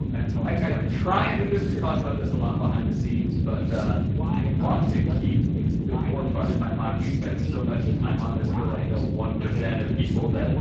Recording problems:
off-mic speech; far
room echo; noticeable; dies away in 0.6 s
garbled, watery; slightly
voice in the background; loud; throughout; 8 dB below the speech
low rumble; loud; throughout; 3 dB below the speech

